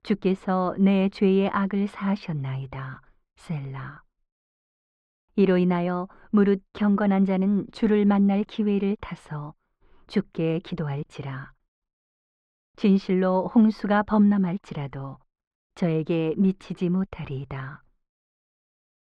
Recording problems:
muffled; very; fading above 1.5 kHz

